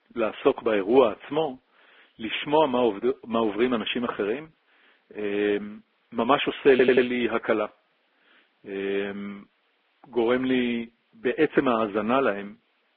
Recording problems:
garbled, watery; badly
phone-call audio; nothing above 3.5 kHz
audio stuttering; at 6.5 s

